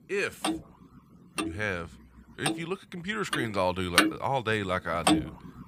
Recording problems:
household noises; very loud; throughout; 2 dB above the speech

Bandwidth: 15 kHz